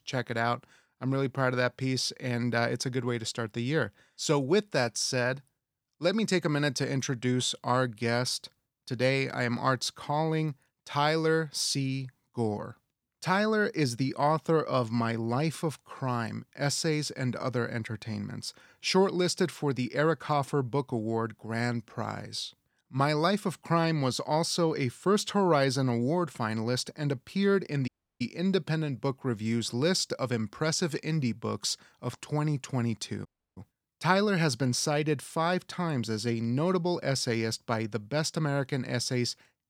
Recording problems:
audio cutting out; at 28 s and at 33 s

